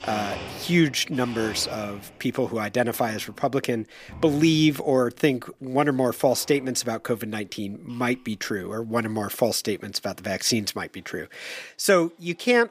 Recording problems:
household noises; noticeable; throughout; 15 dB below the speech

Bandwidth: 15 kHz